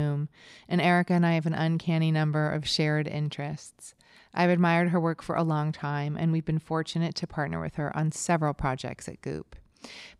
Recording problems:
abrupt cut into speech; at the start

